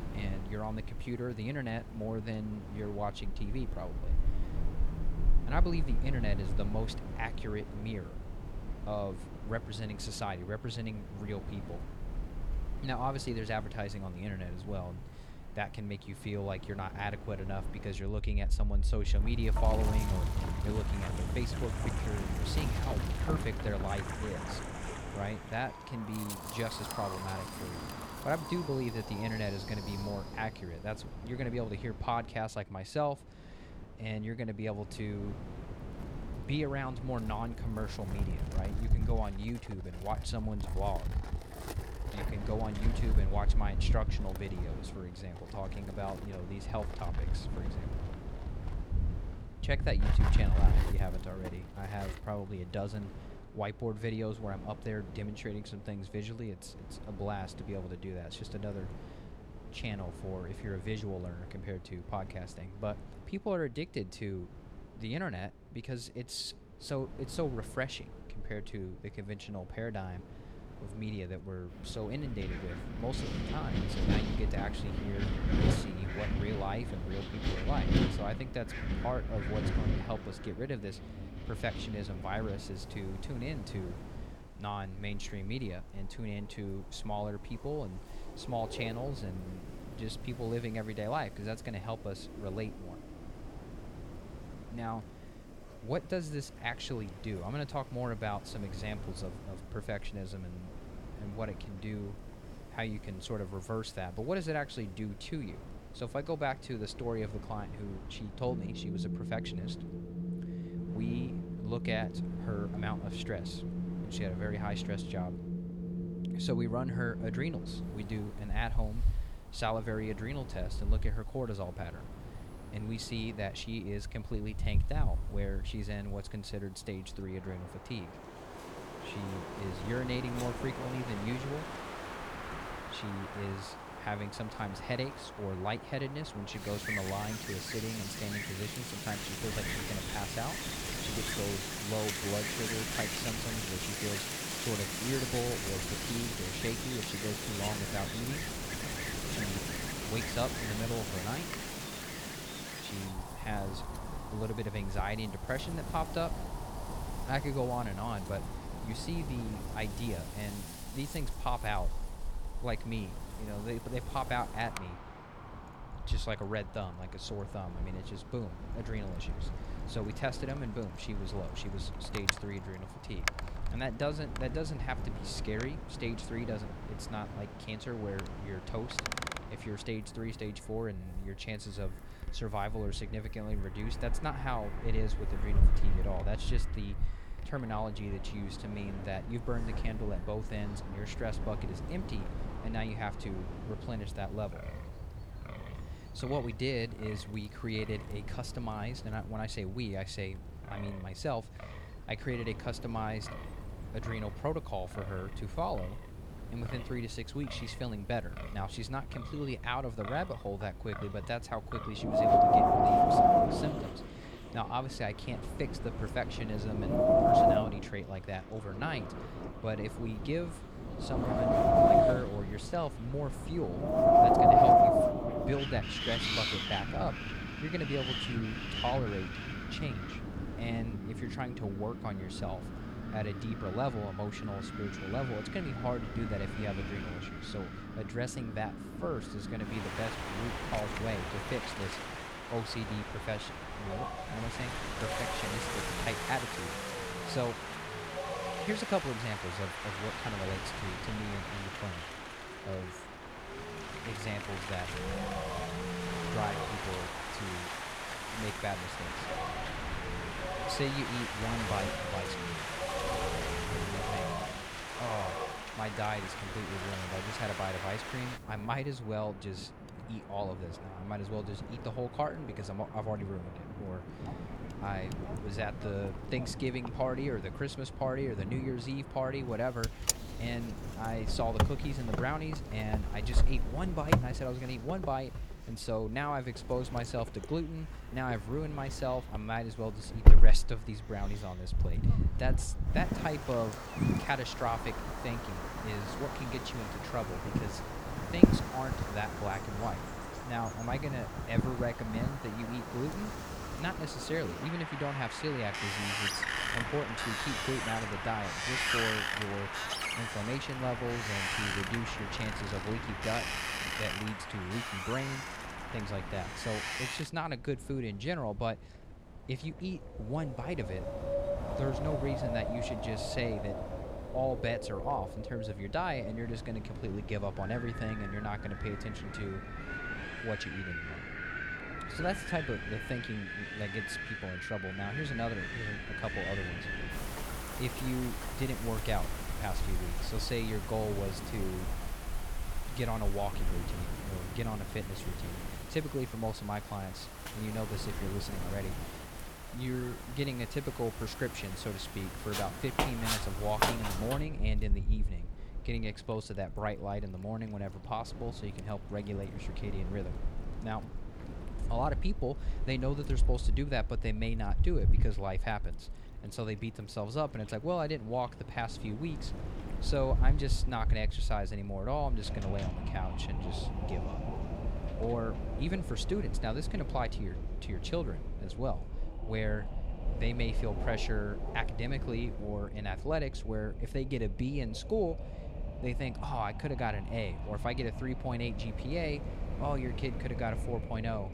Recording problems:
wind in the background; very loud; throughout; 2 dB above the speech

